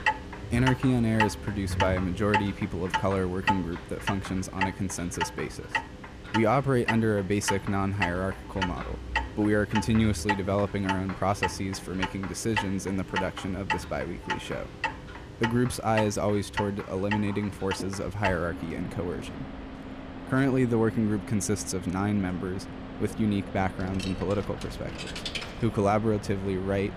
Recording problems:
household noises; loud; throughout; 6 dB below the speech

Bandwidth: 14.5 kHz